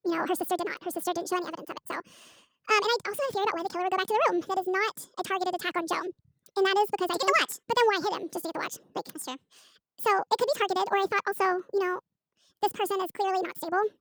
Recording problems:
wrong speed and pitch; too fast and too high; 1.7 times normal speed

